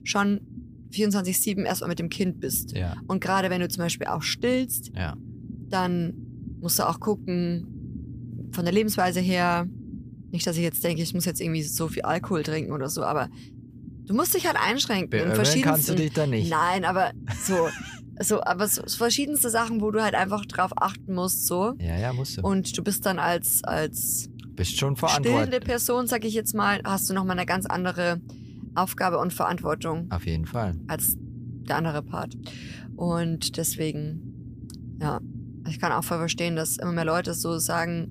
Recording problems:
low rumble; faint; throughout; 25 dB below the speech

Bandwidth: 15 kHz